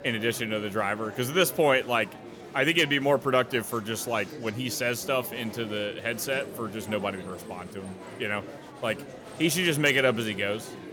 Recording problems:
murmuring crowd; noticeable; throughout; 15 dB below the speech

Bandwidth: 18 kHz